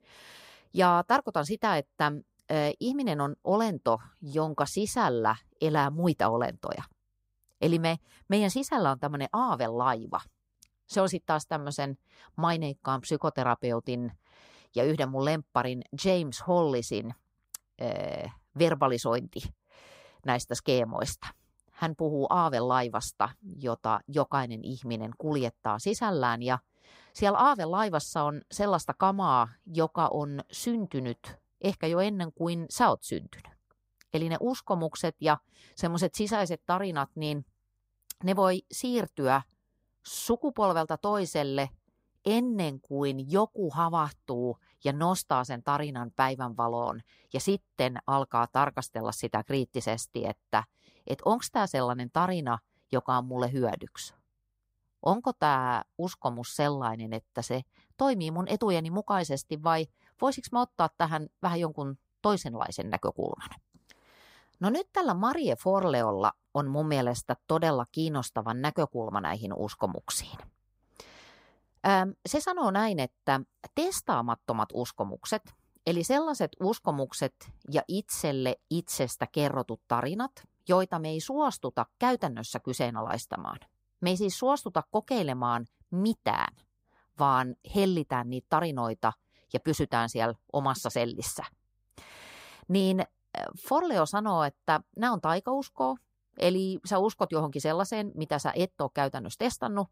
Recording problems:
none

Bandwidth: 15.5 kHz